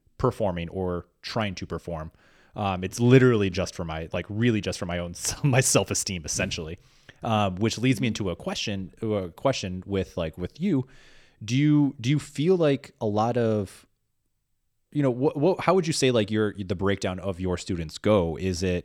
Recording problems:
none

